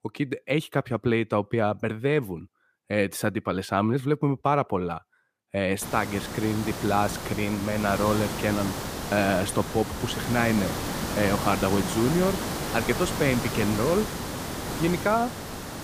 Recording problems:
hiss; loud; from 6 s on; 5 dB below the speech

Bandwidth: 15 kHz